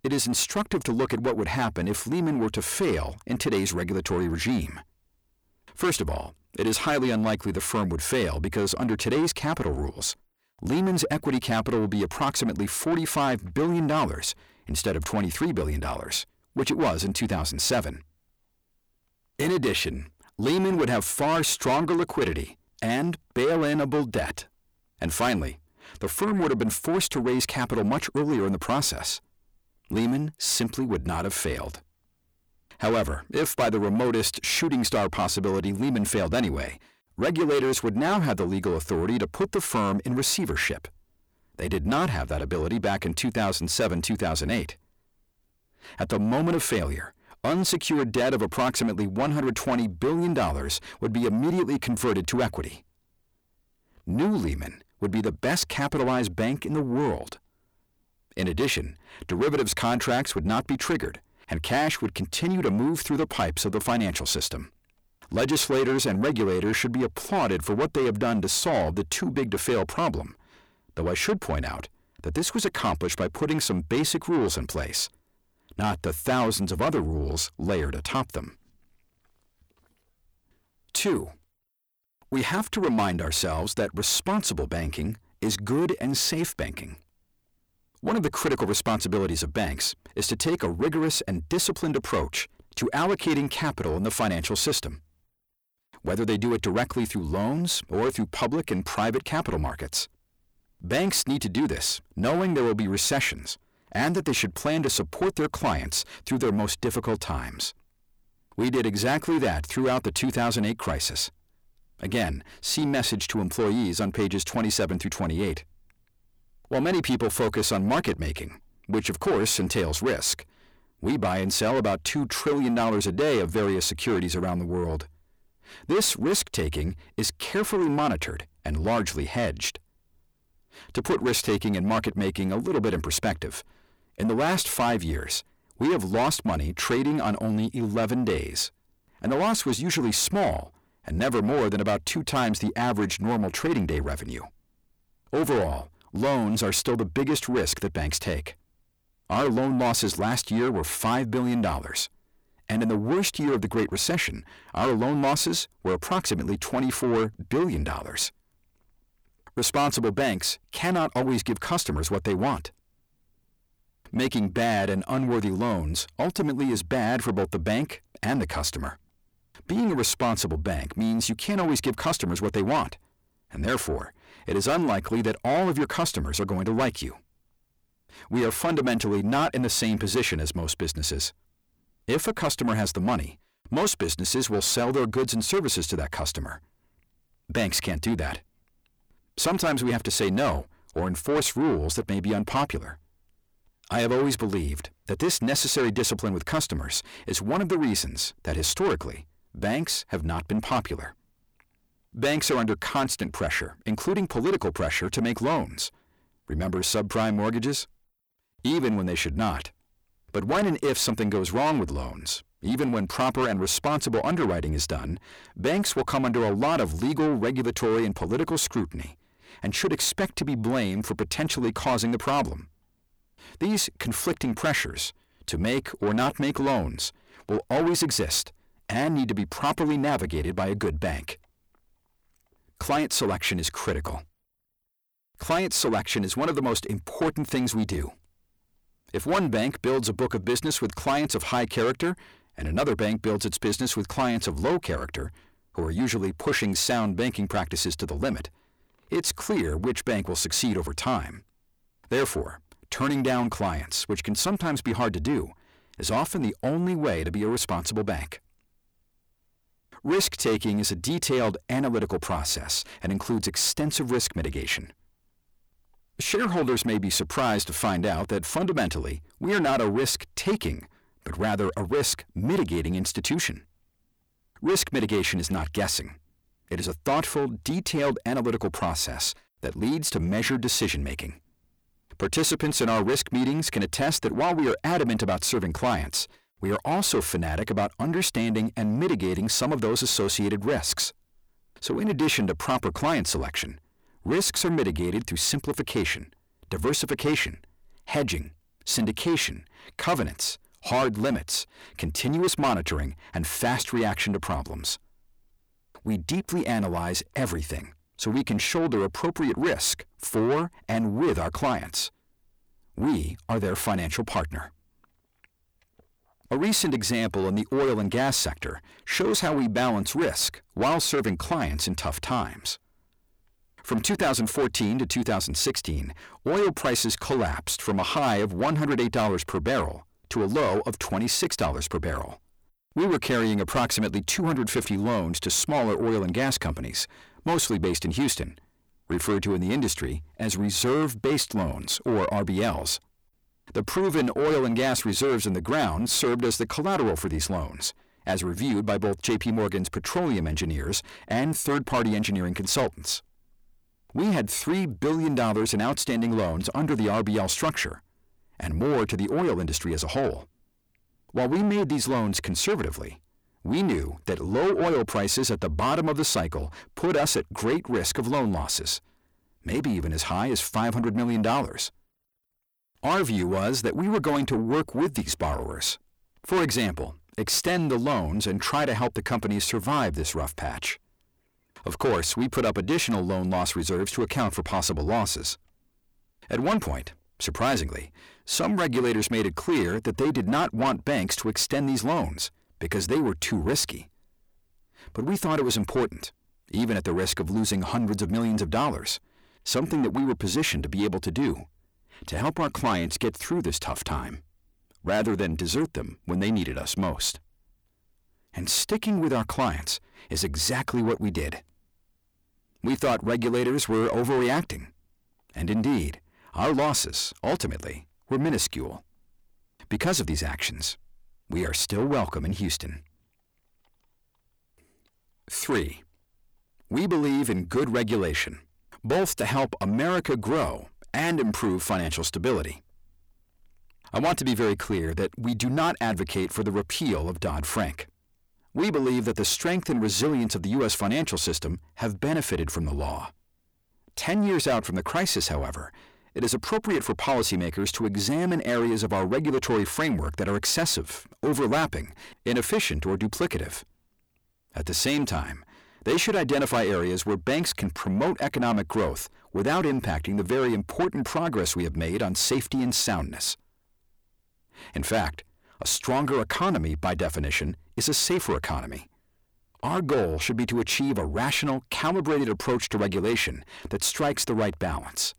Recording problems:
distortion; heavy; 7 dB below the speech

